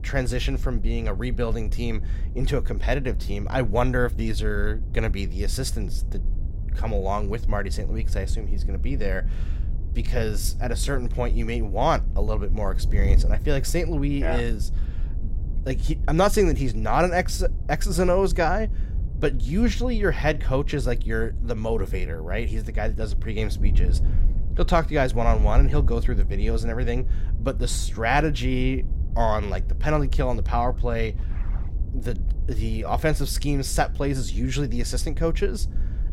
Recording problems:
wind noise on the microphone; occasional gusts; 20 dB below the speech

